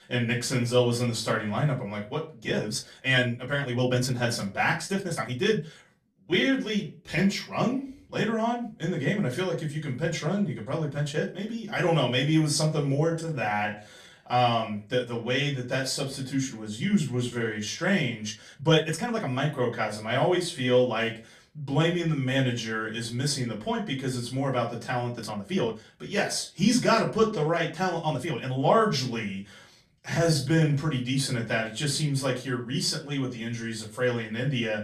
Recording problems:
off-mic speech; far
room echo; very slight; dies away in 0.3 s
uneven, jittery; strongly; from 2.5 to 31 s

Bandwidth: 14.5 kHz